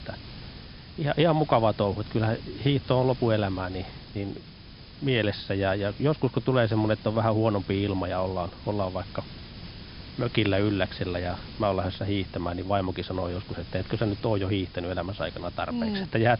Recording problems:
high frequencies cut off; noticeable; nothing above 5.5 kHz
hiss; noticeable; throughout; 15 dB below the speech

